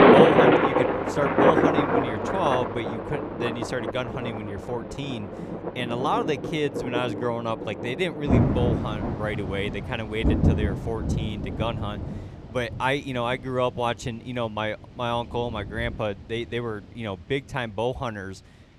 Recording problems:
rain or running water; very loud; throughout; 4 dB above the speech

